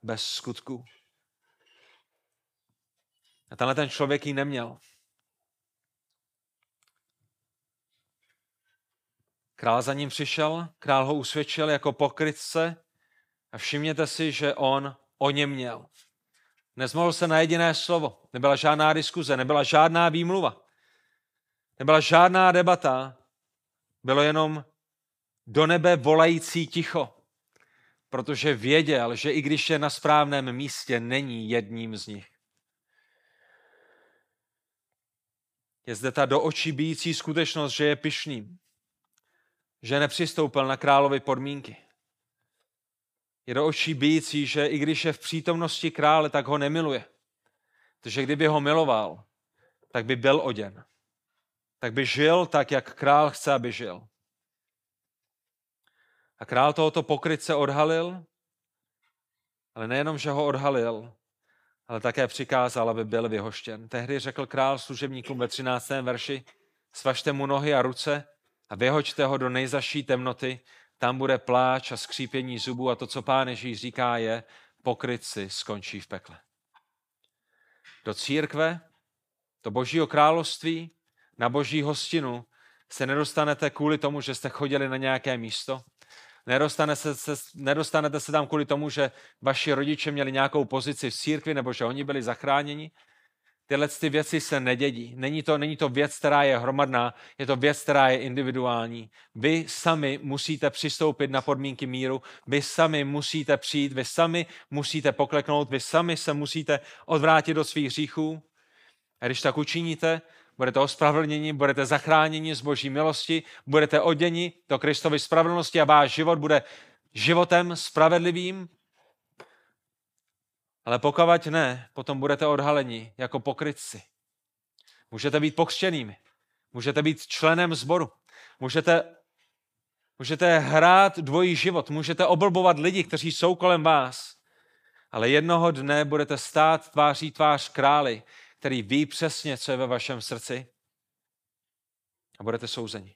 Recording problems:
none

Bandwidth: 15 kHz